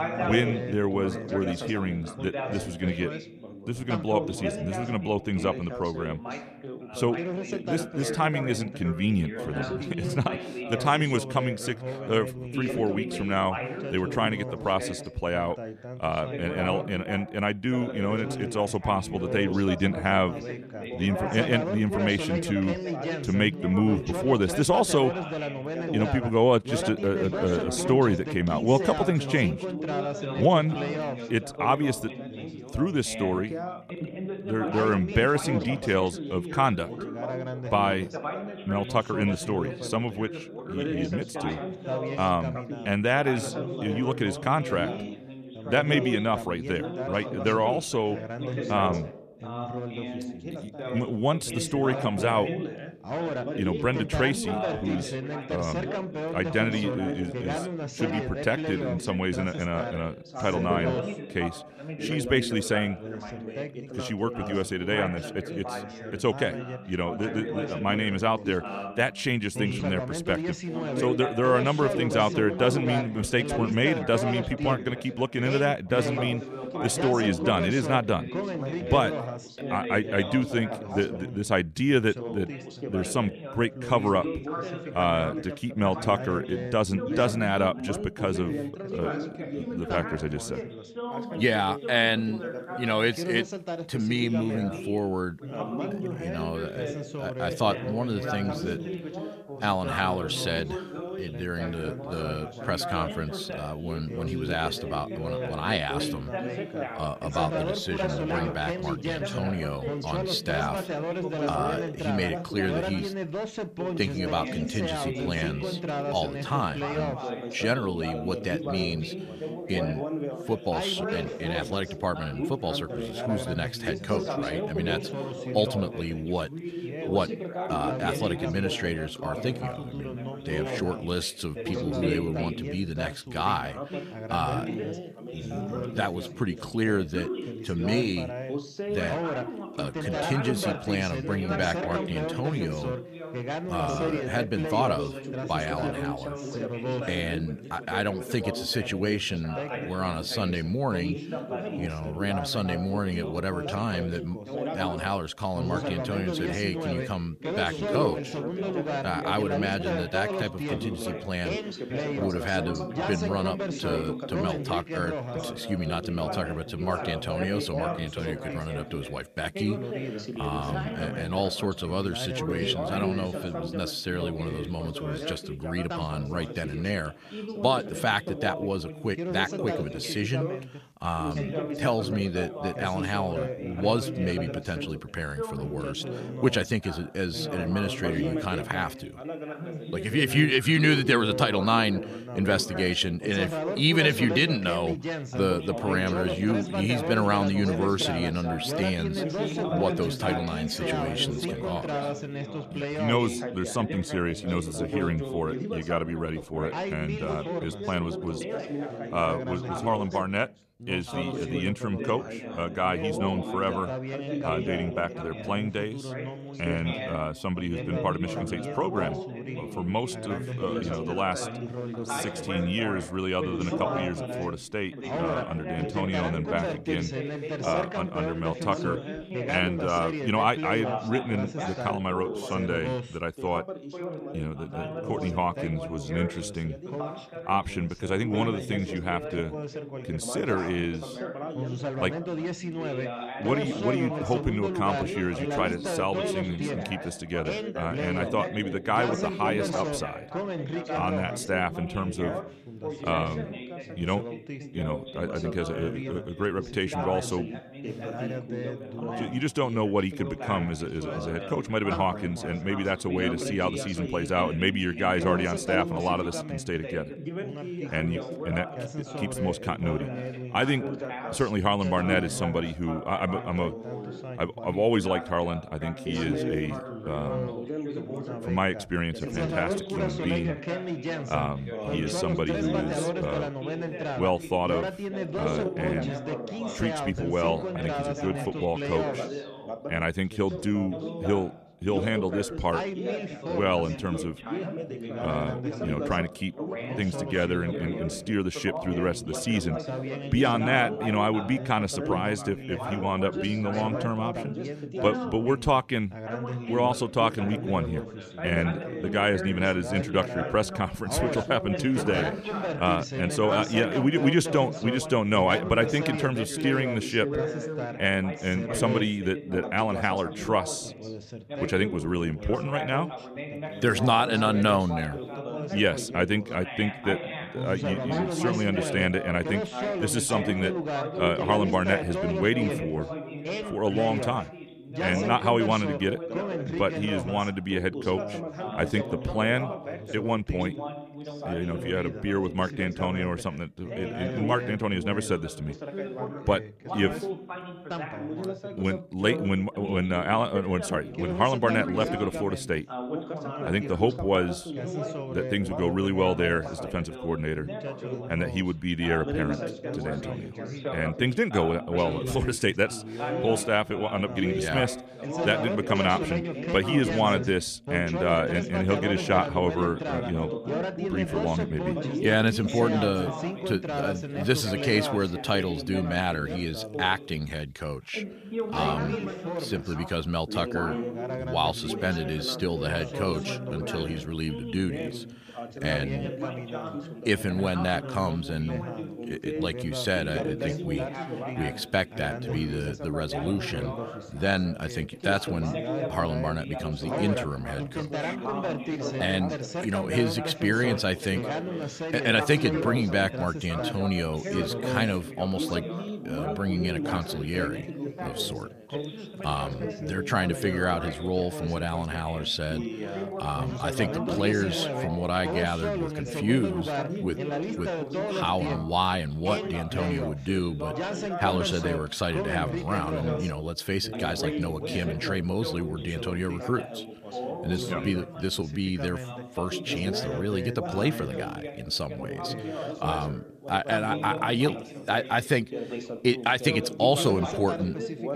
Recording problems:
background chatter; loud; throughout; 3 voices, 5 dB below the speech

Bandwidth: 14.5 kHz